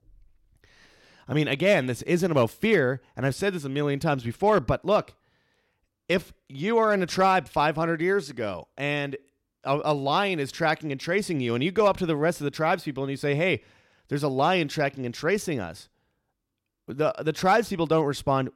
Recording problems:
none

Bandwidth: 16.5 kHz